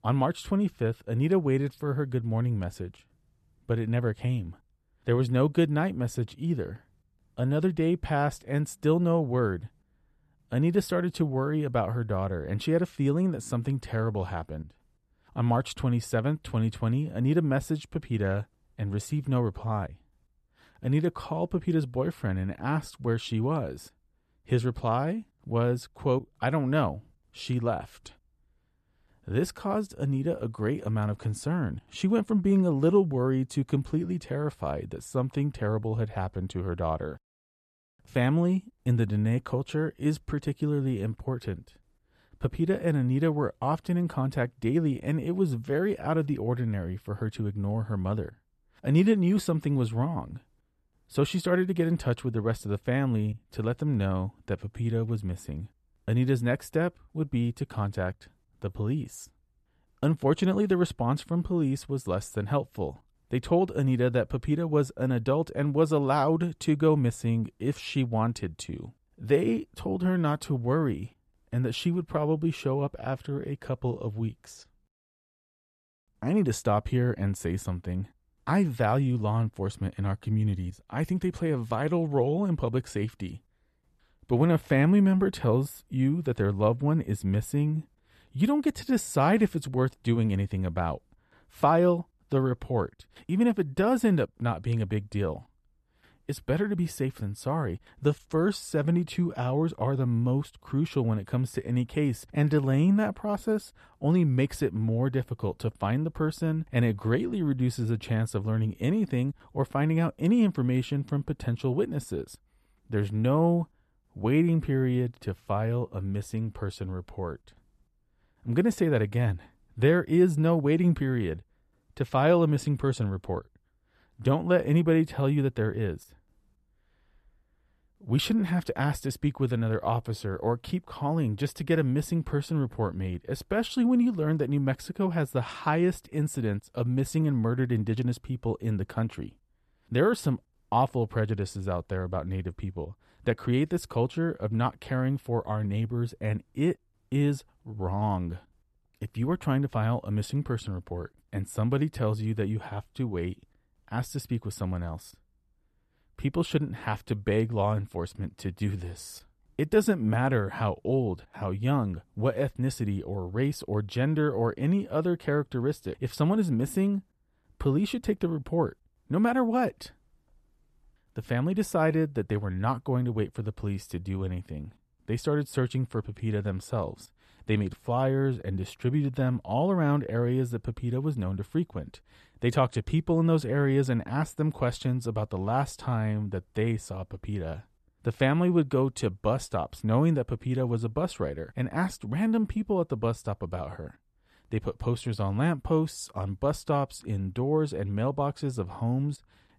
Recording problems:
none

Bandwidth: 13.5 kHz